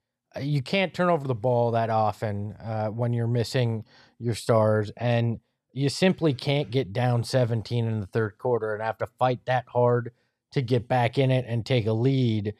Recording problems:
none

